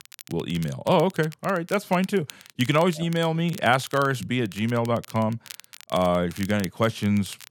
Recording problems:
crackle, like an old record; noticeable; 20 dB below the speech

